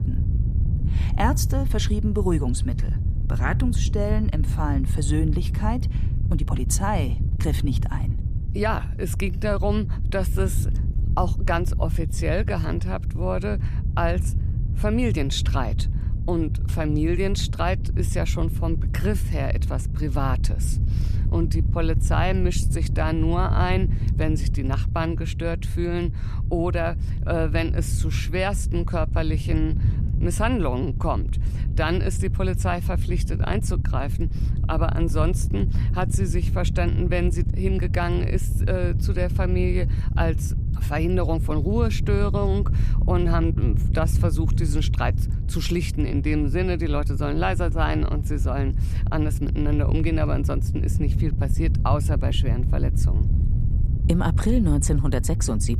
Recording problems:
wind noise on the microphone; occasional gusts; 10 dB below the speech

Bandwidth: 14.5 kHz